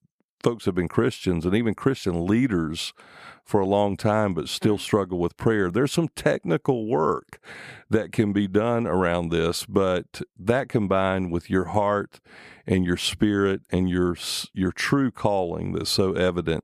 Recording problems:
none

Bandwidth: 14.5 kHz